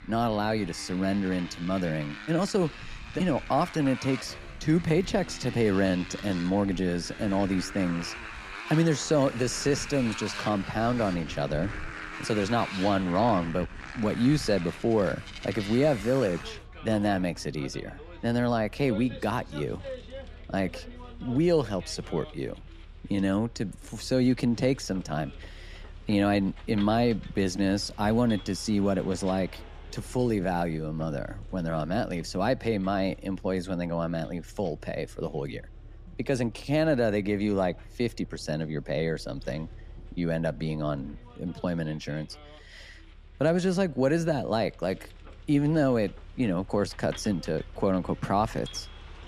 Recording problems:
traffic noise; noticeable; throughout; 15 dB below the speech

